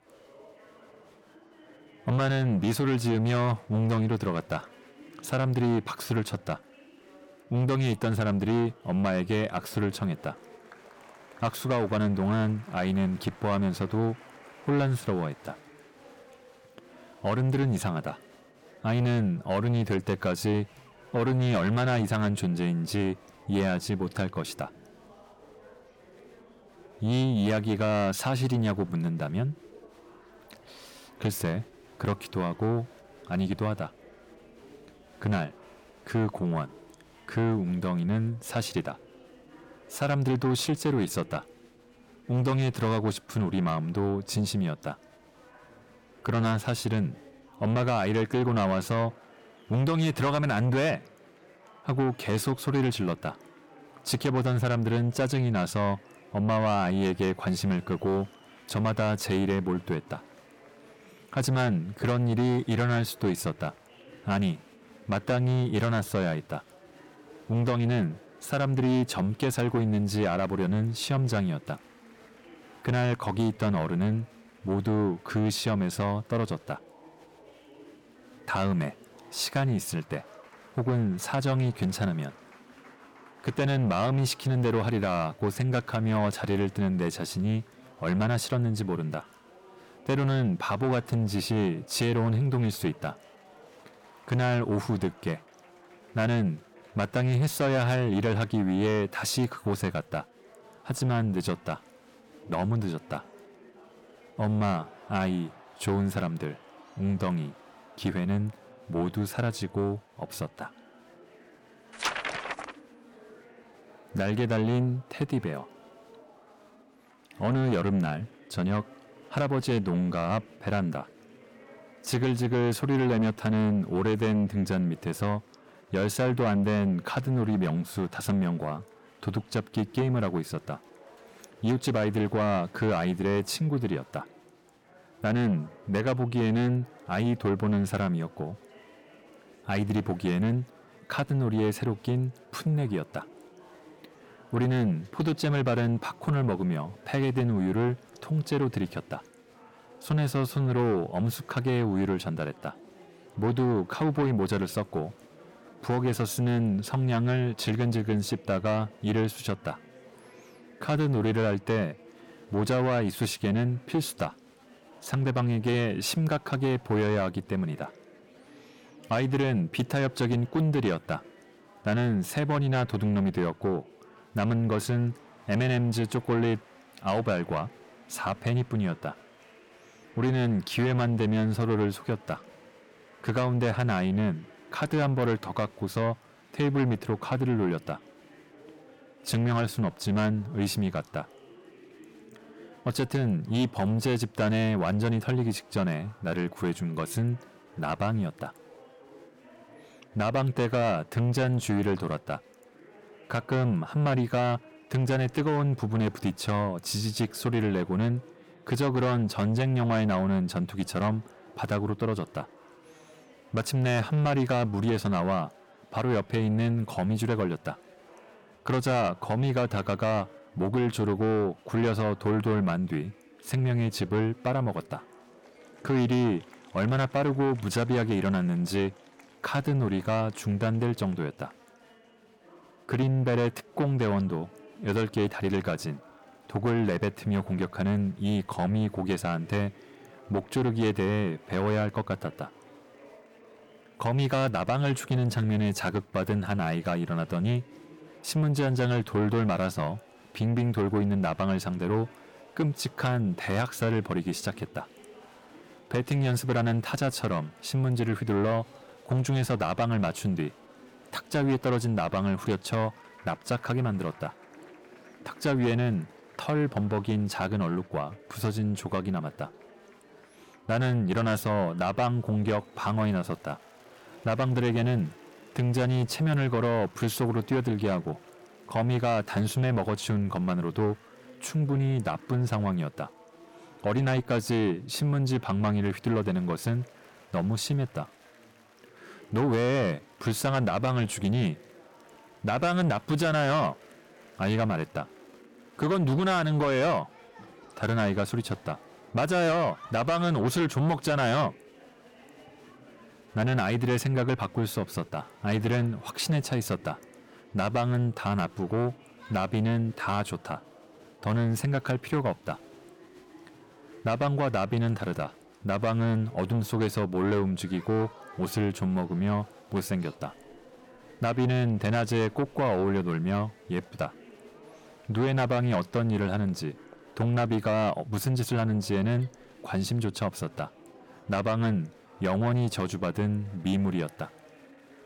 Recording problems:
distortion; slight; 10 dB below the speech
murmuring crowd; faint; throughout; 25 dB below the speech

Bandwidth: 17.5 kHz